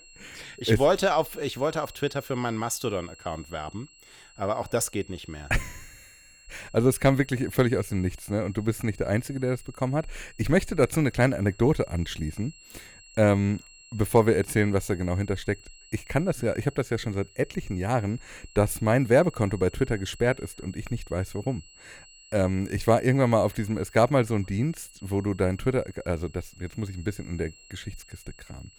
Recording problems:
high-pitched whine; faint; throughout; 3 kHz, 25 dB below the speech

